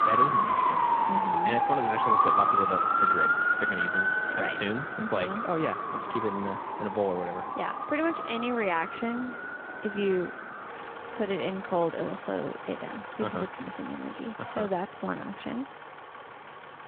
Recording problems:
phone-call audio
traffic noise; very loud; throughout; 5 dB above the speech

